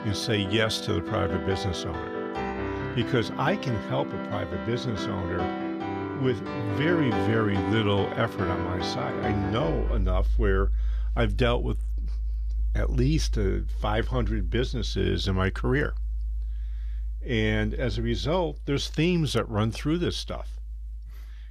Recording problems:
background music; loud; throughout; 4 dB below the speech

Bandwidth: 14.5 kHz